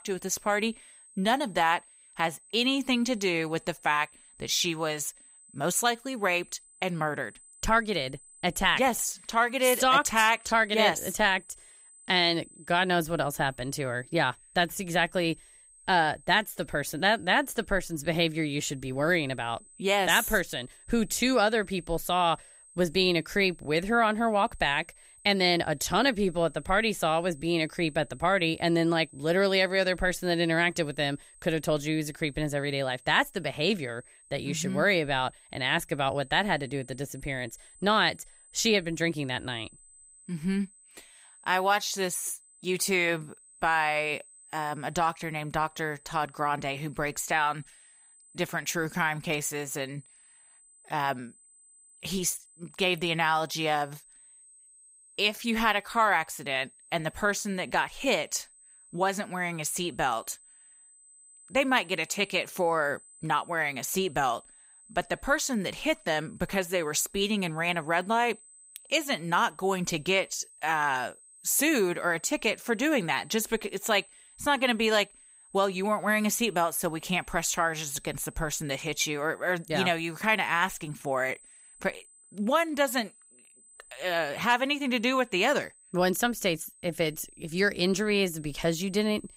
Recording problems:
high-pitched whine; faint; throughout; 8.5 kHz, 25 dB below the speech

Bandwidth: 15.5 kHz